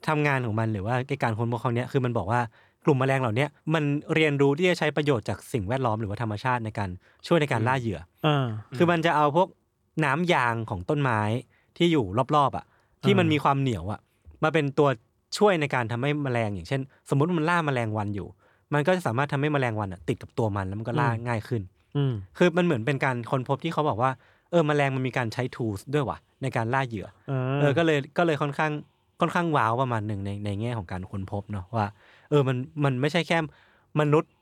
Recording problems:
none

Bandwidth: 18.5 kHz